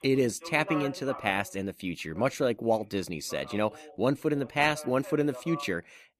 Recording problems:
voice in the background; noticeable; throughout; 15 dB below the speech

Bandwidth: 14.5 kHz